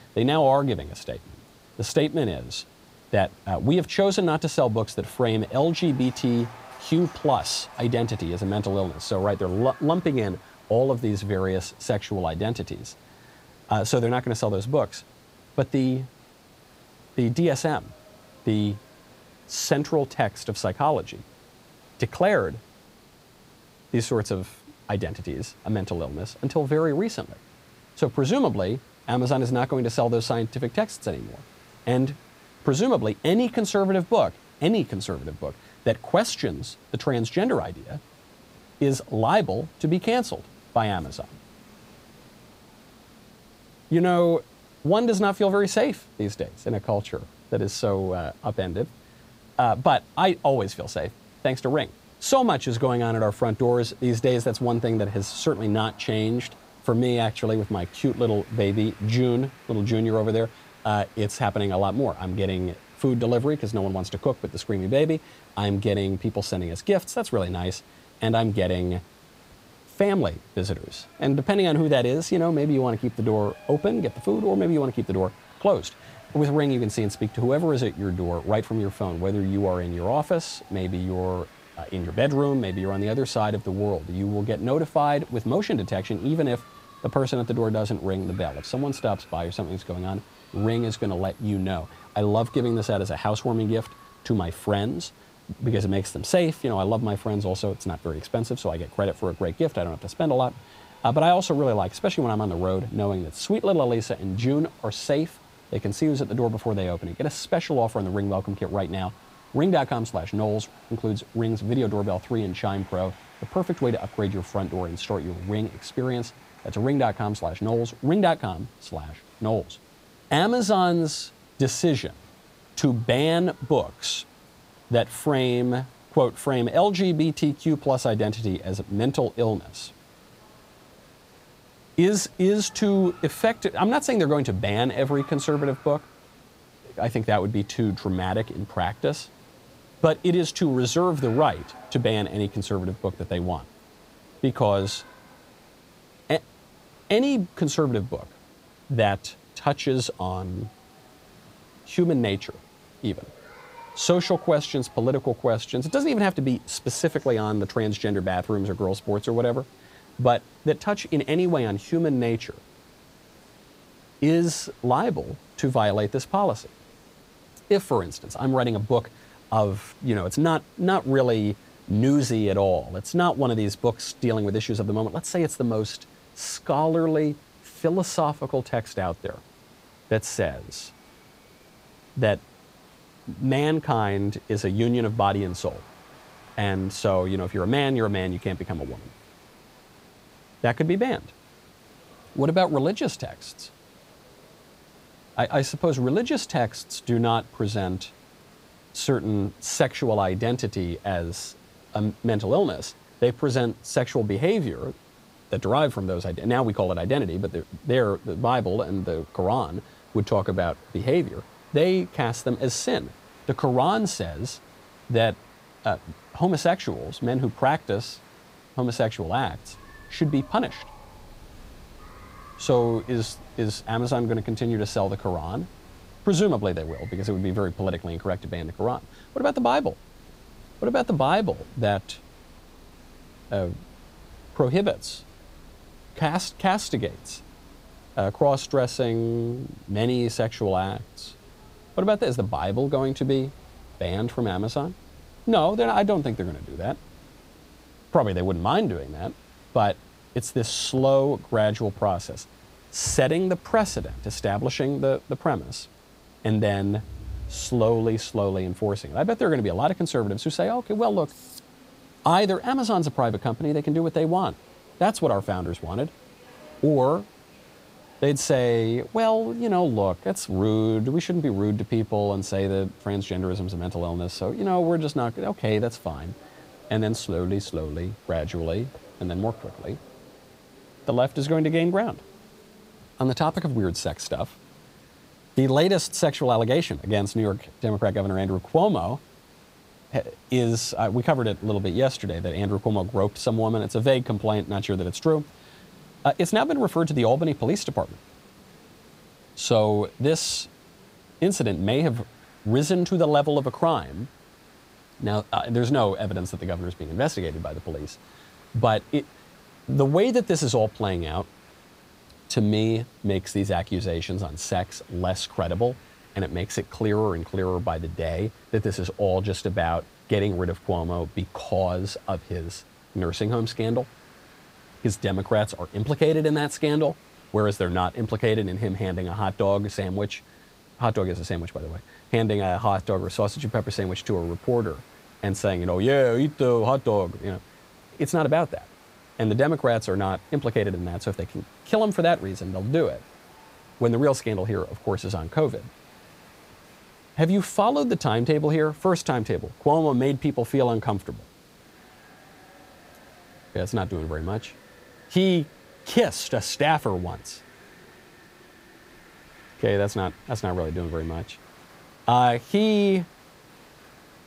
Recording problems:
crowd noise; faint; throughout; 30 dB below the speech
hiss; faint; throughout; 30 dB below the speech

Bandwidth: 15.5 kHz